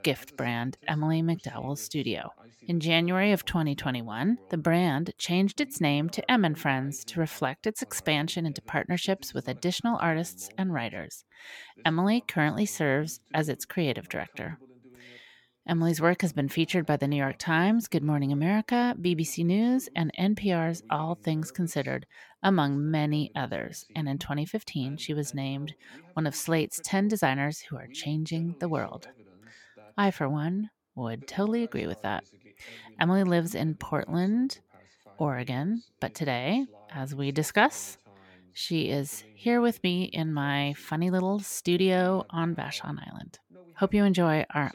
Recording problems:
voice in the background; faint; throughout; 30 dB below the speech

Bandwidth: 17 kHz